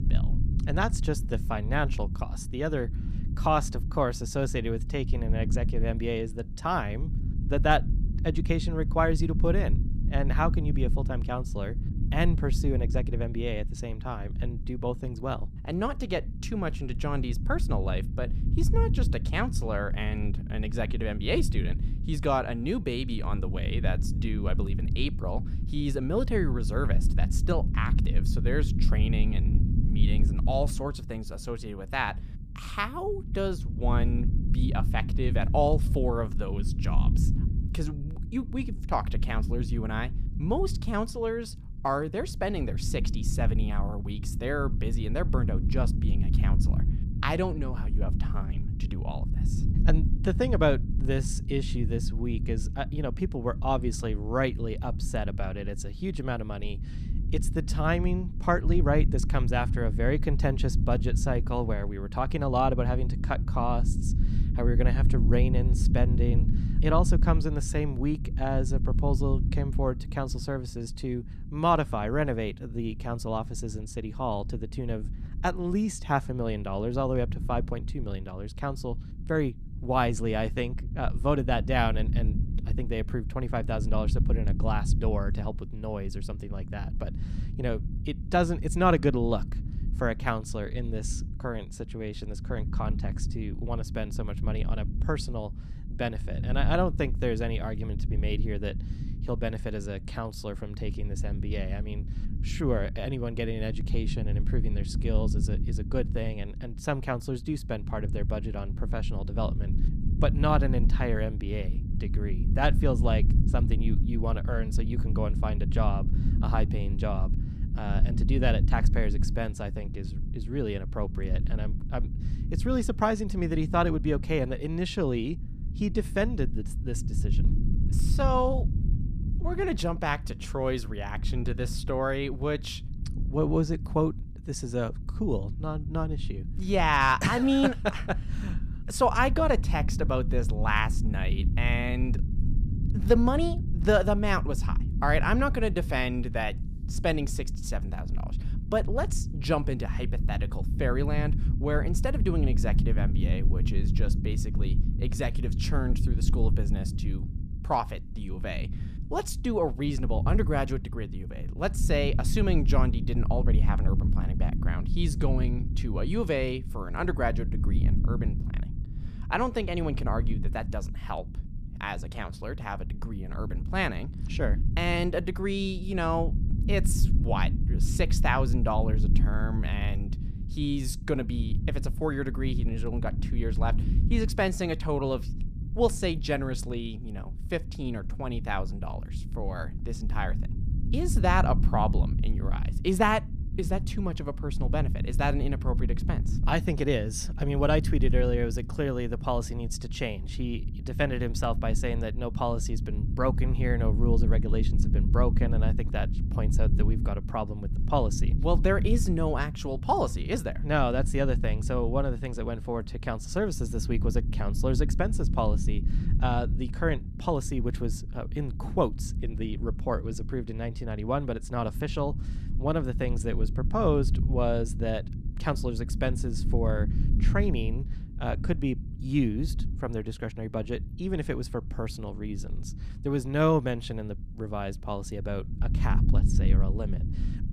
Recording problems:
low rumble; noticeable; throughout; 15 dB below the speech

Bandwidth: 14.5 kHz